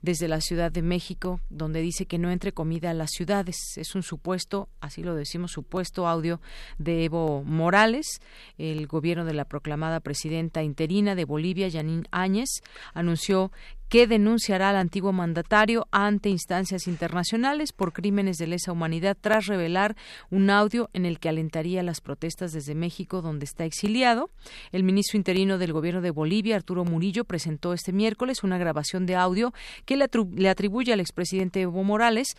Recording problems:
none

